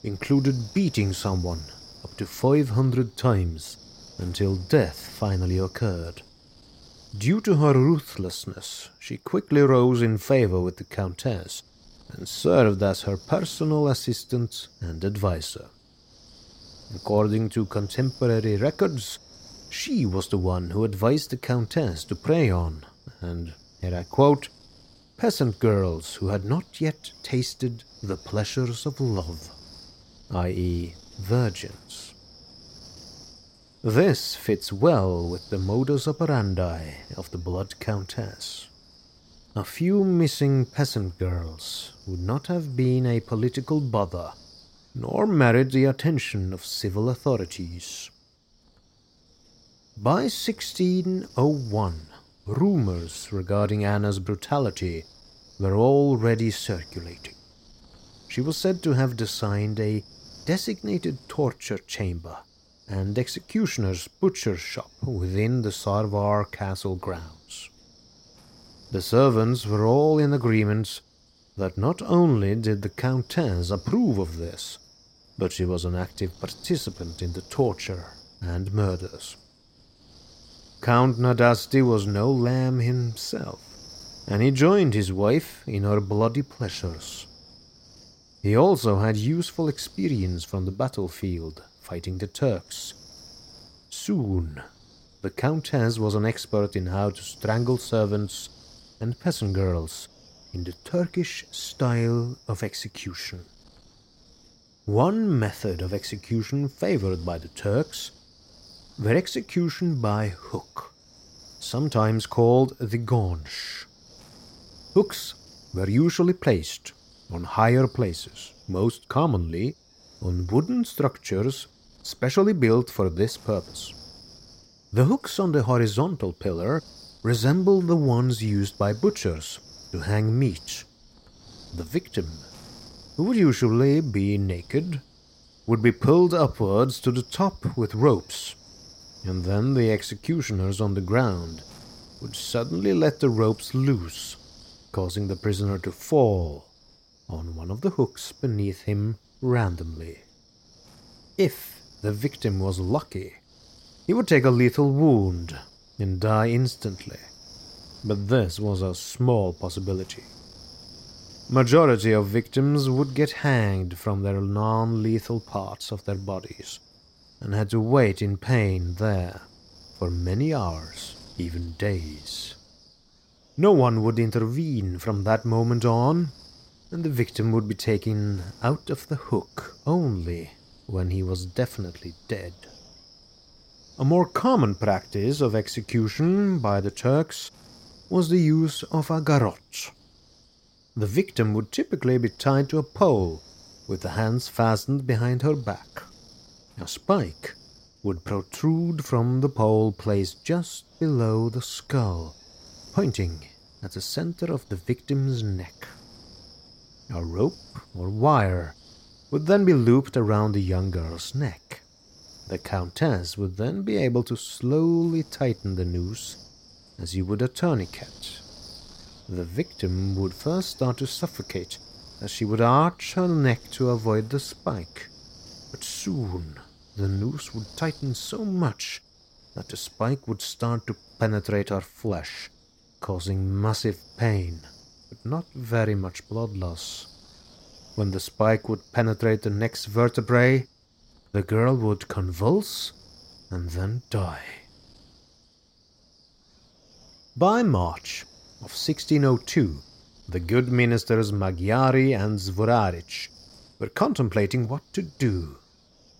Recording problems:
wind noise on the microphone; occasional gusts; 20 dB below the speech

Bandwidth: 16 kHz